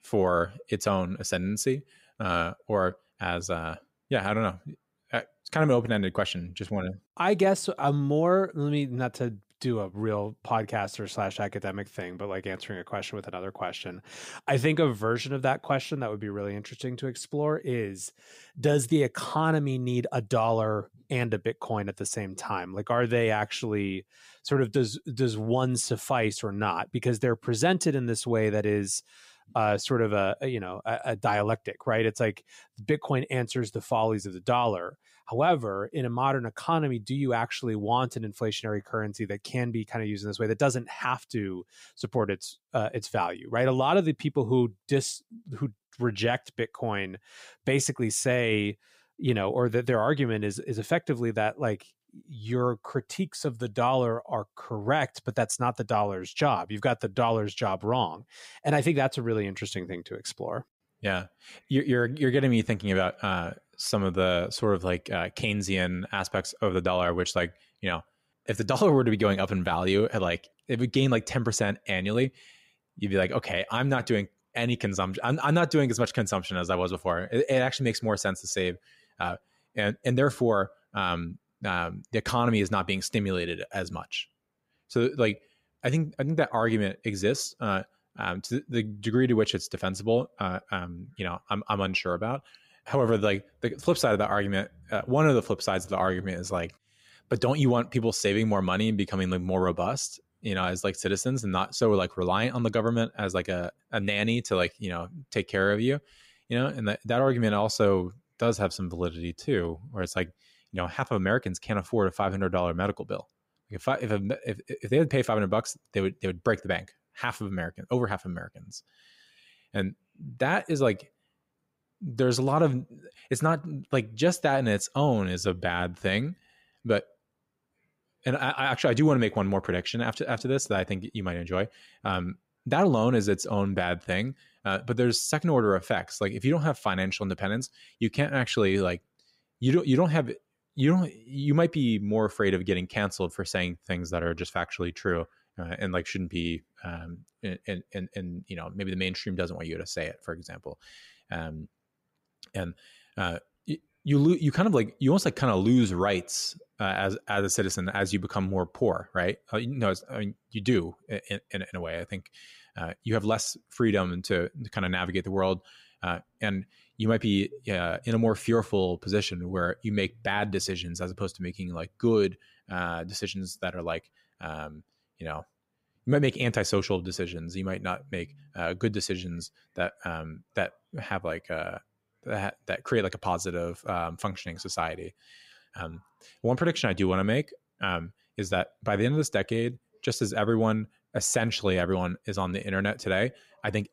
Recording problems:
none

